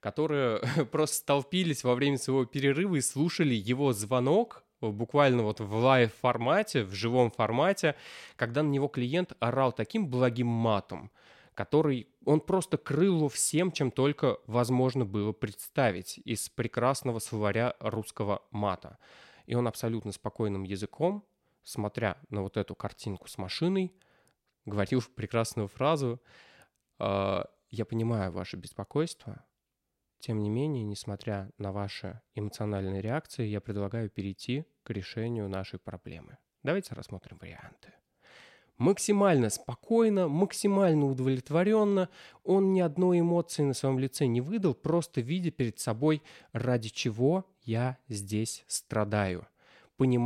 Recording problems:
abrupt cut into speech; at the end

